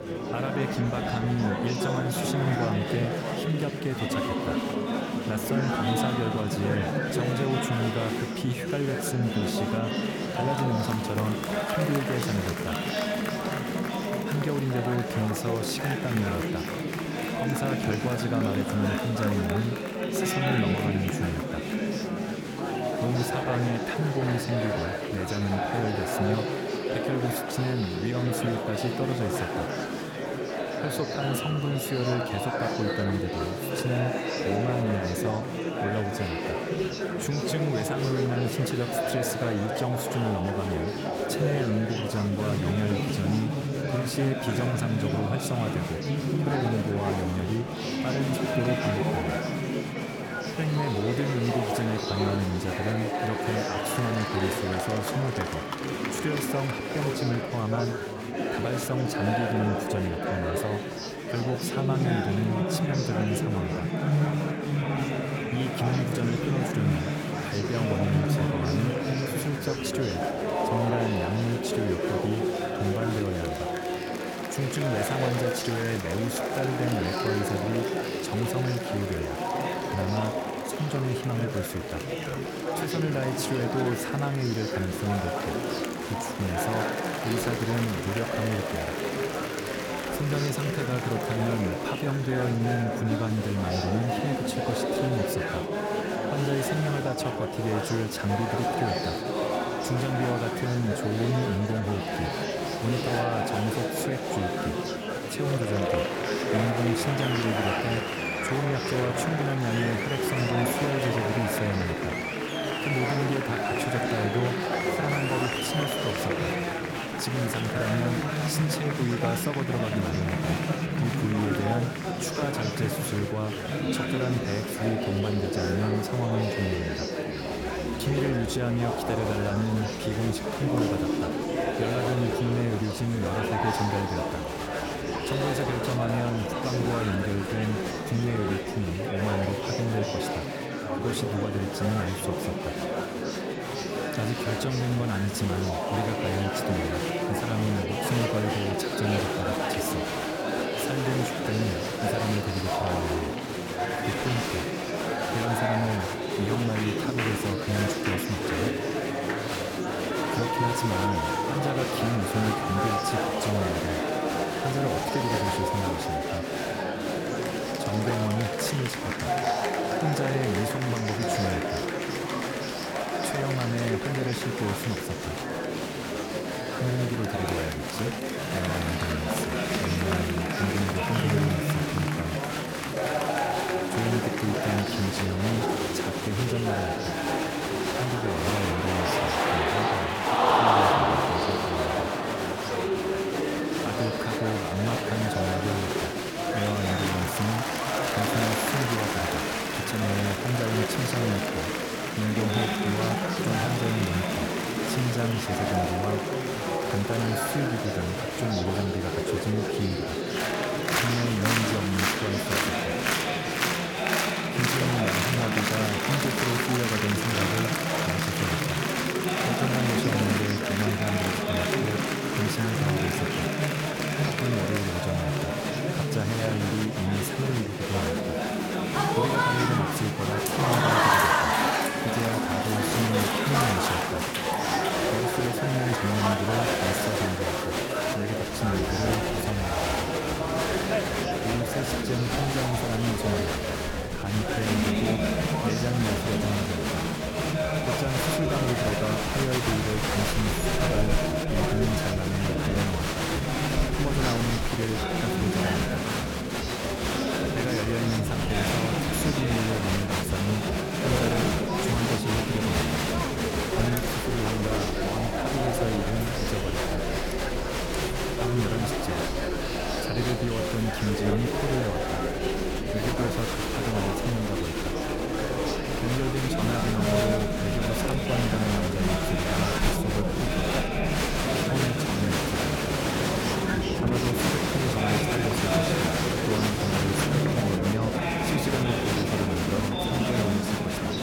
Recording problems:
murmuring crowd; very loud; throughout; 3 dB above the speech

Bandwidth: 18 kHz